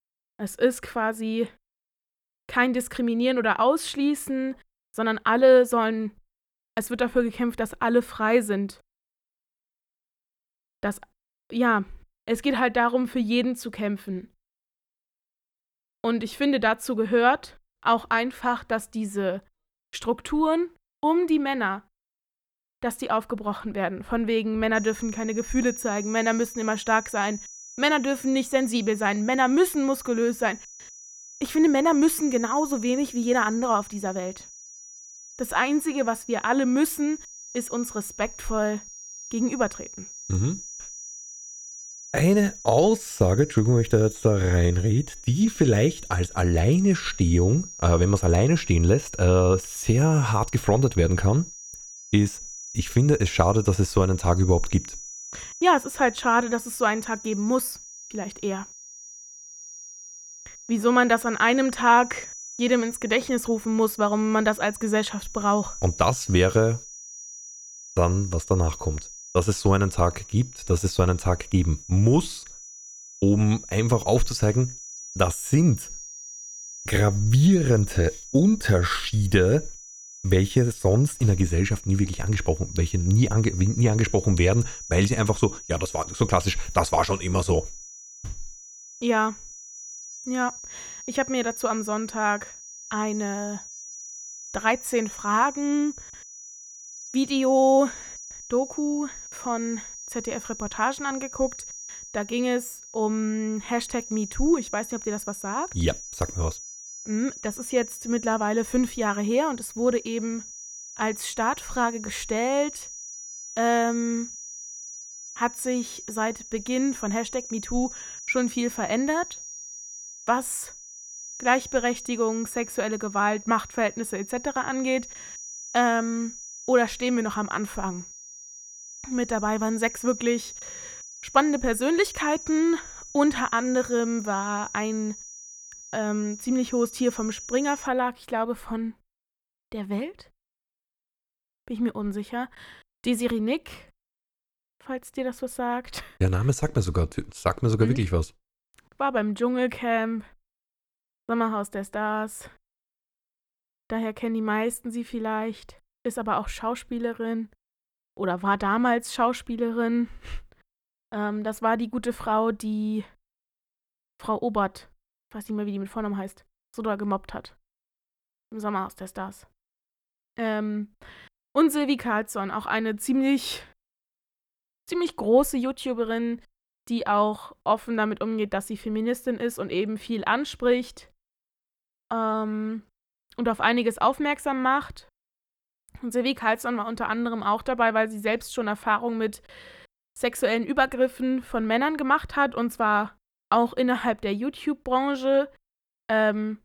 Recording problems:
high-pitched whine; noticeable; from 25 s to 2:18; 6 kHz, 15 dB below the speech

